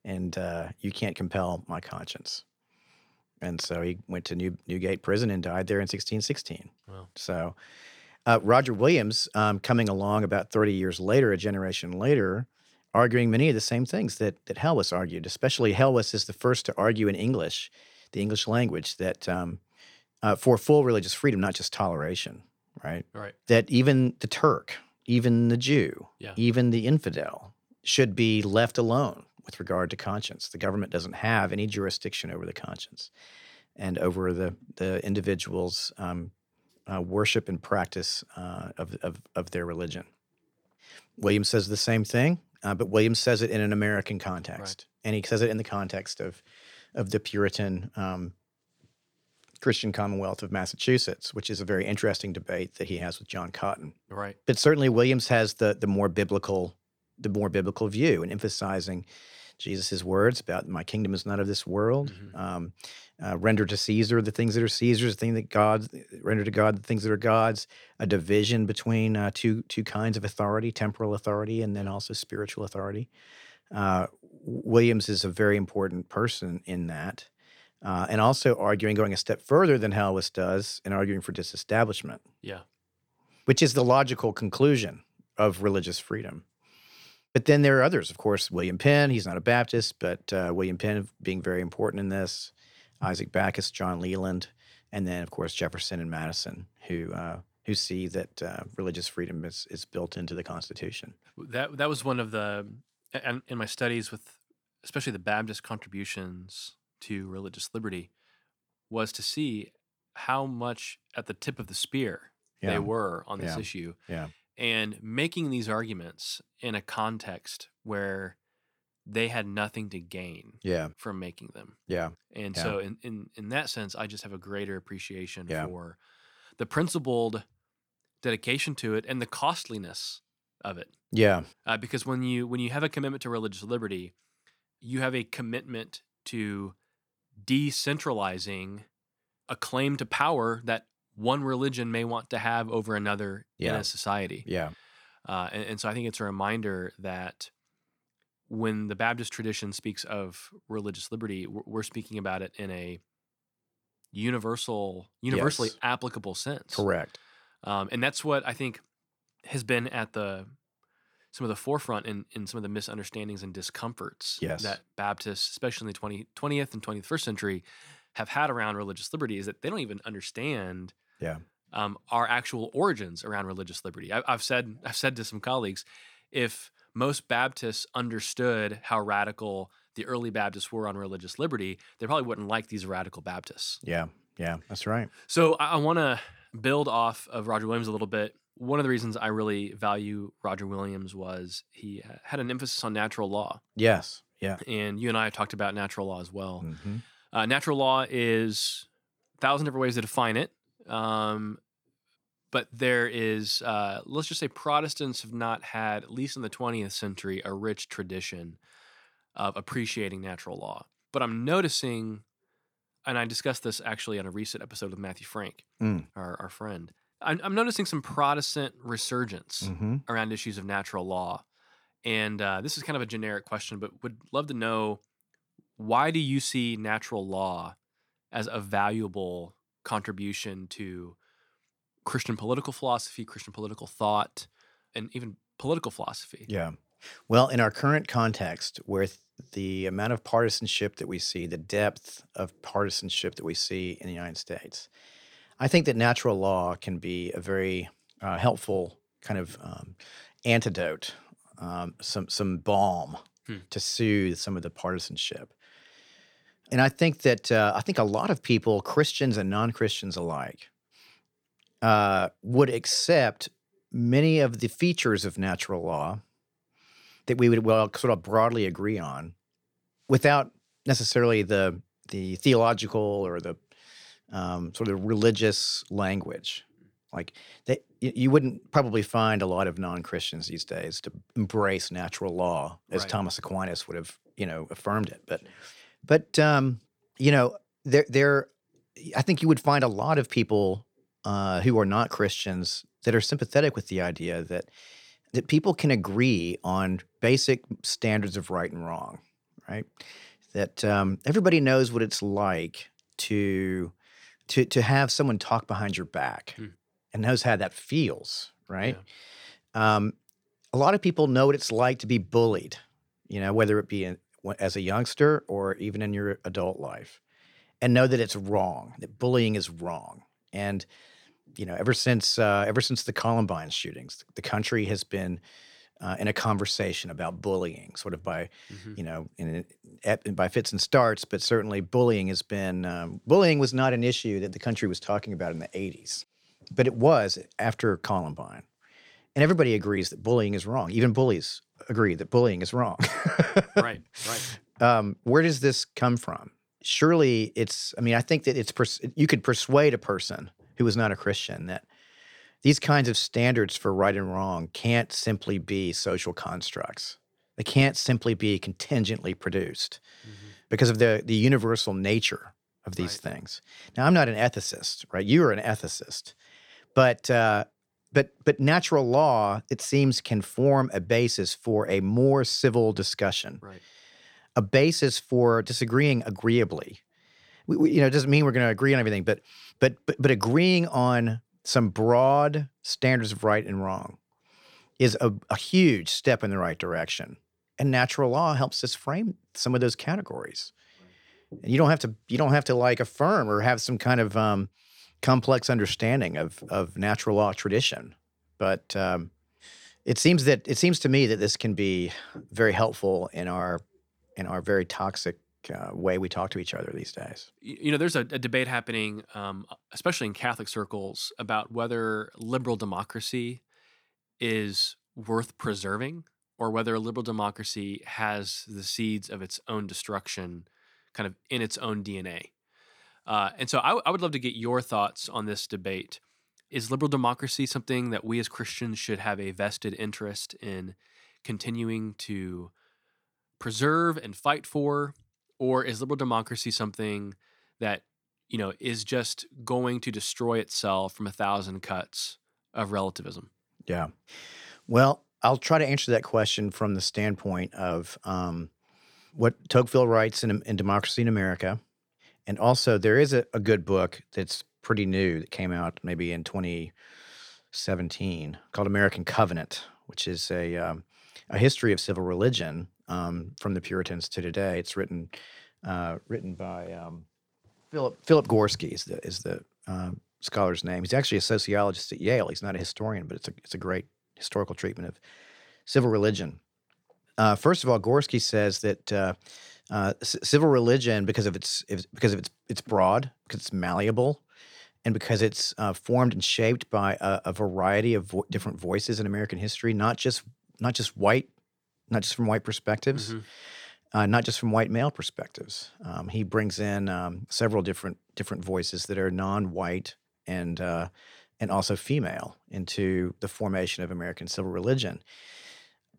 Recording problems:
none

